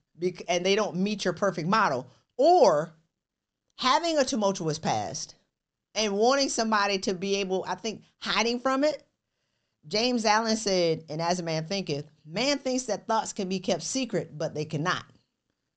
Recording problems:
high frequencies cut off; noticeable; nothing above 8 kHz

